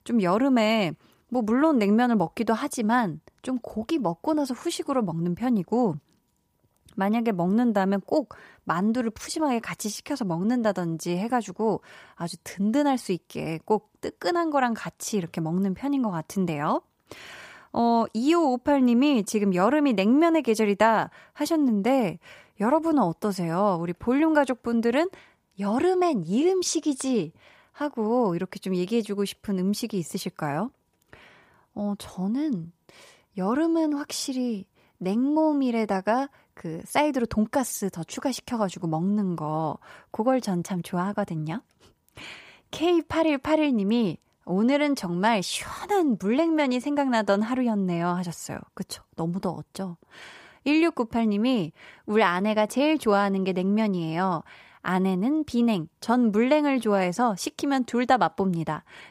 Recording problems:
none

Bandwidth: 15 kHz